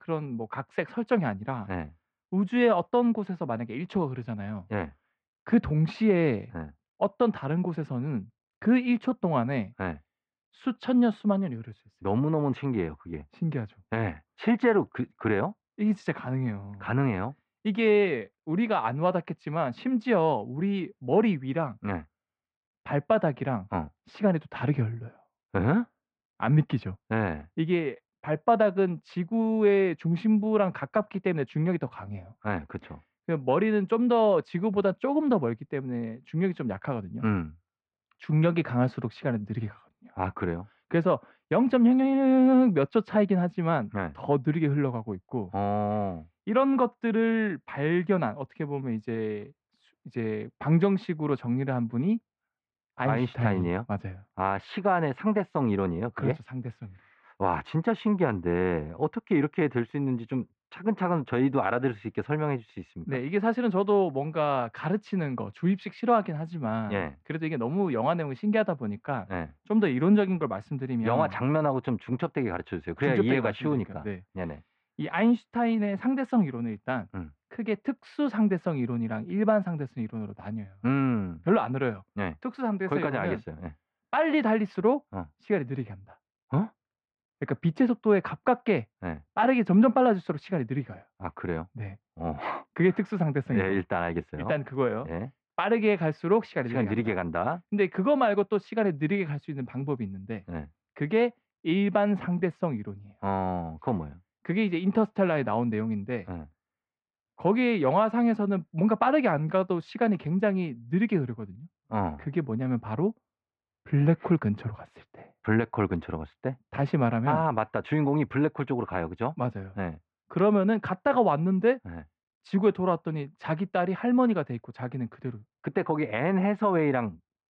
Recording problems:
muffled; very; fading above 2 kHz

